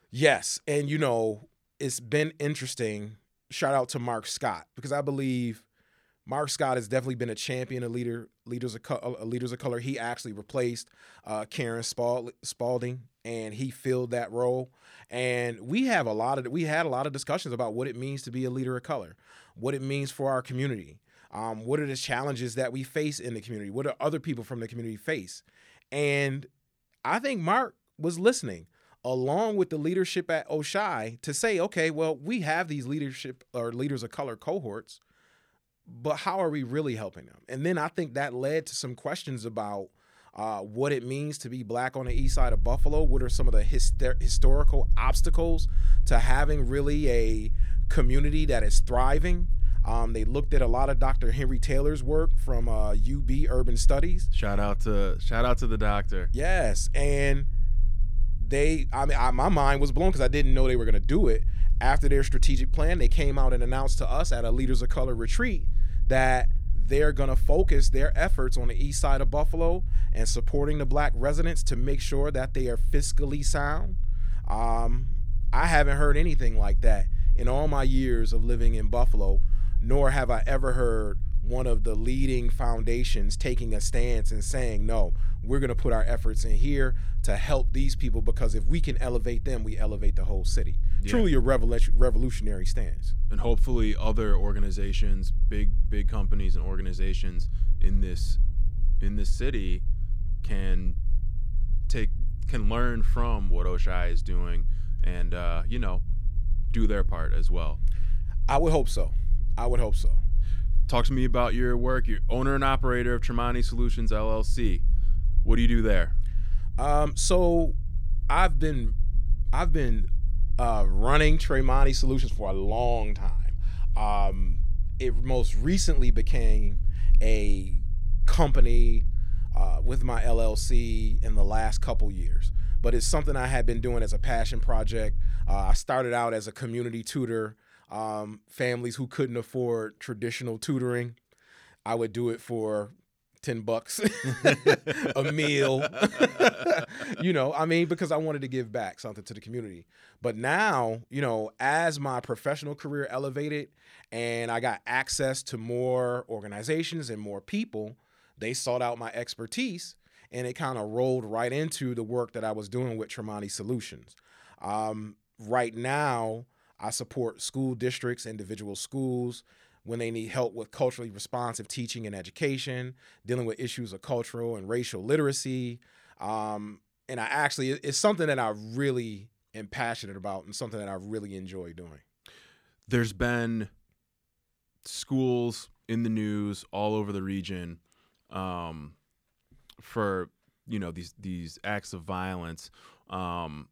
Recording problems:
low rumble; faint; from 42 s to 2:16; 20 dB below the speech

